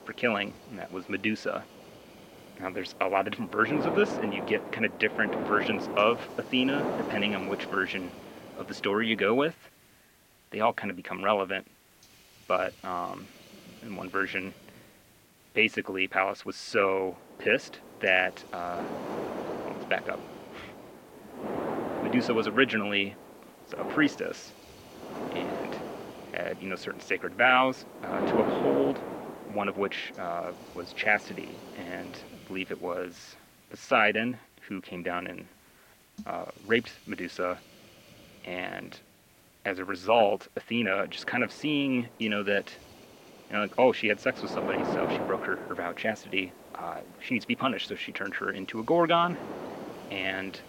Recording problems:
muffled; slightly; fading above 3 kHz
thin; somewhat; fading below 350 Hz
wind noise on the microphone; heavy; until 9.5 s, from 17 to 32 s and from 41 s on; 9 dB below the speech
hiss; faint; throughout; 25 dB below the speech

